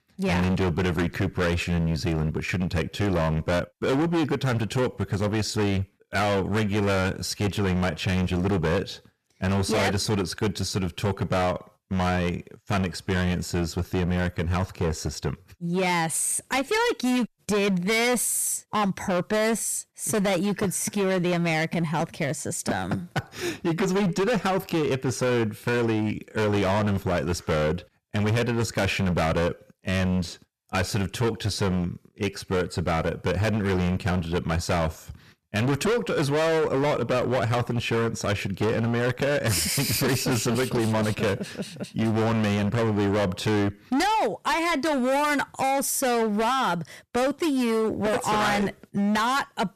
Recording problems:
distortion; heavy; 23% of the sound clipped

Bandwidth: 14 kHz